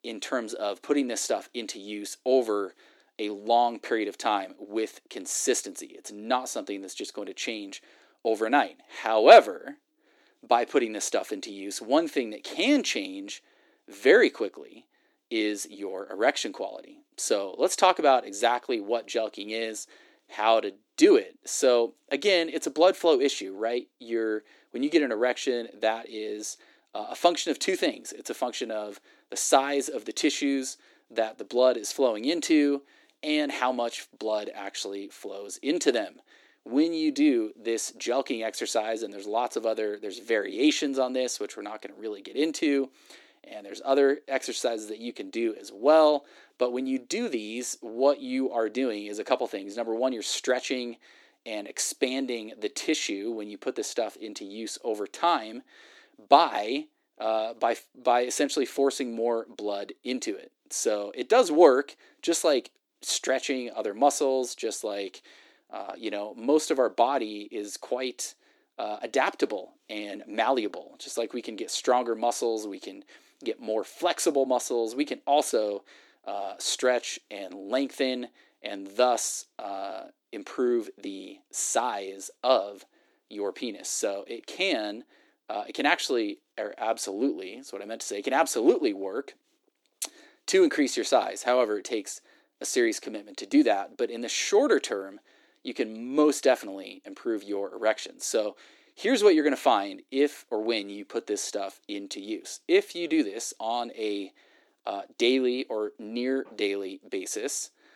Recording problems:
thin; somewhat; fading below 300 Hz

